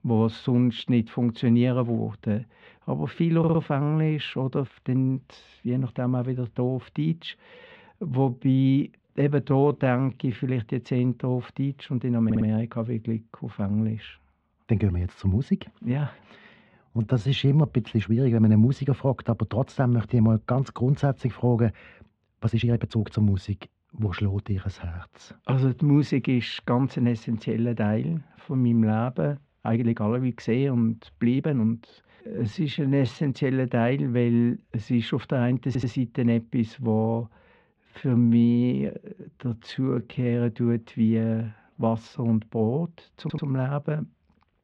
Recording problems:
muffled; very; fading above 3 kHz
audio stuttering; 4 times, first at 3.5 s
uneven, jittery; strongly; from 7.5 to 42 s

